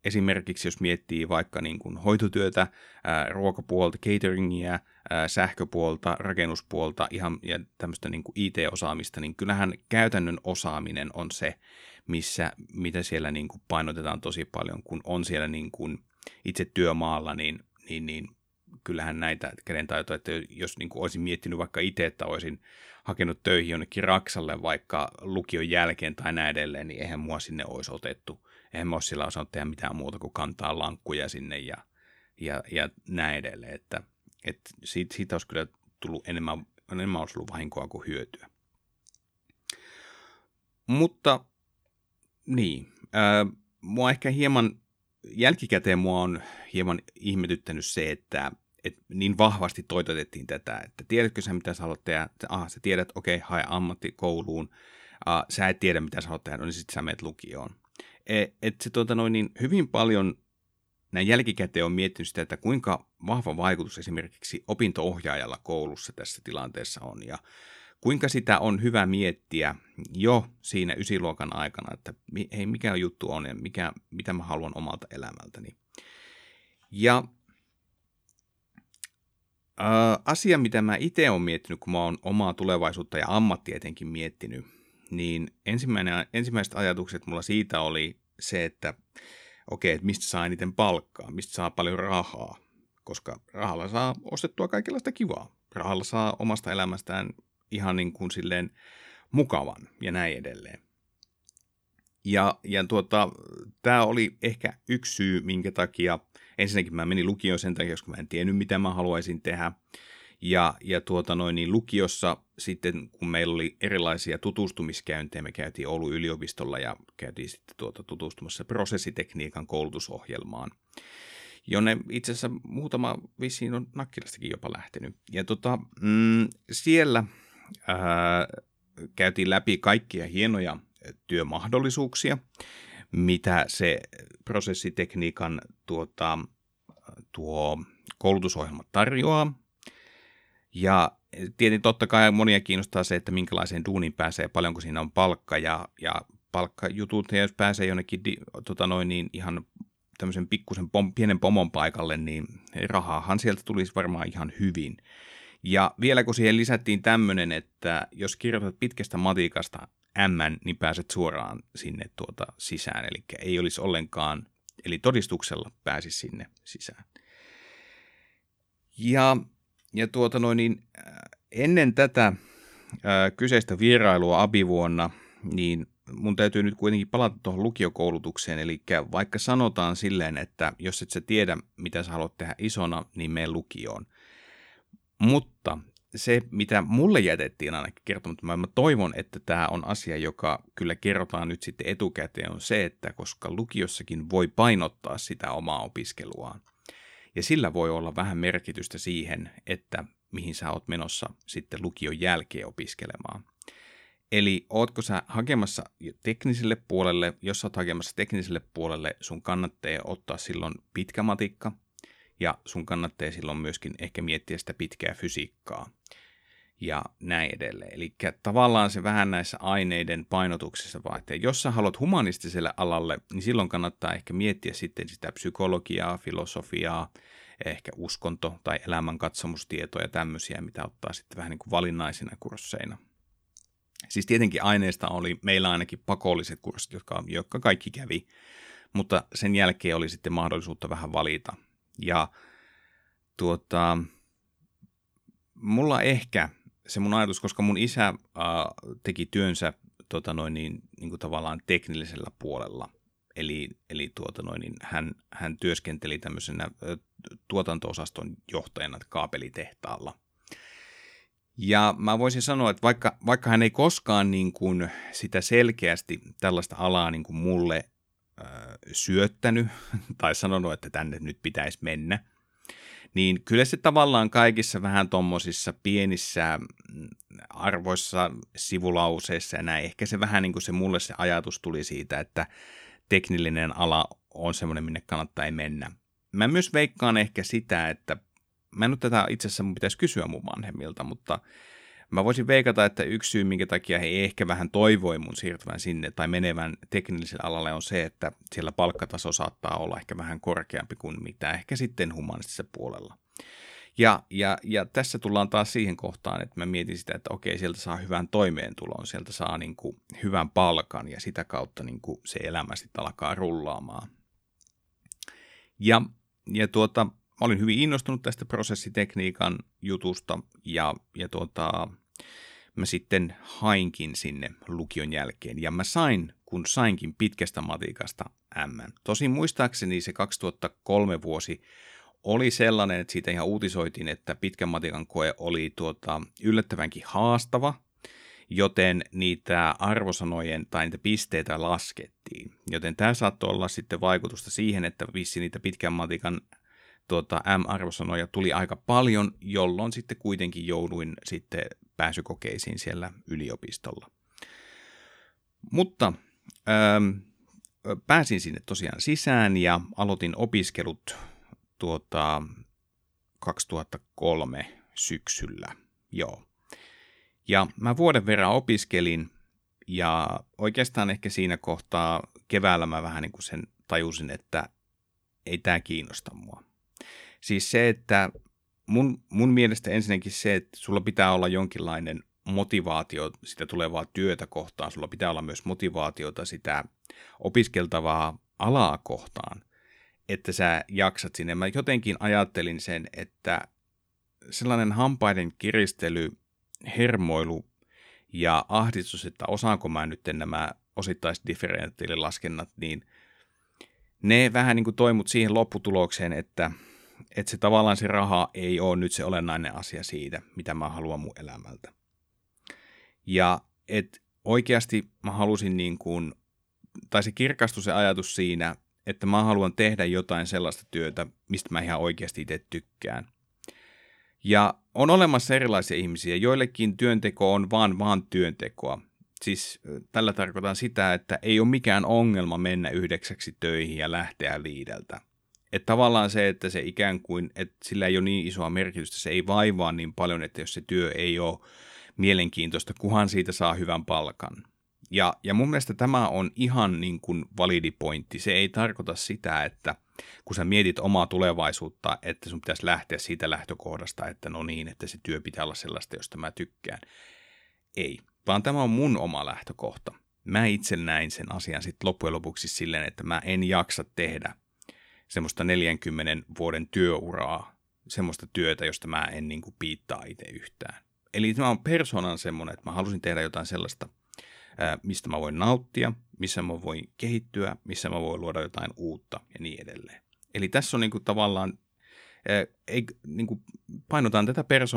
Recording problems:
abrupt cut into speech; at the end

